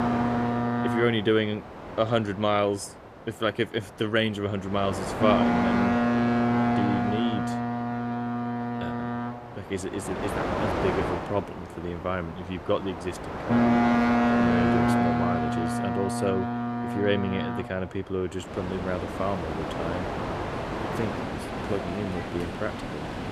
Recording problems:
train or aircraft noise; very loud; throughout; 3 dB above the speech

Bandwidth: 14.5 kHz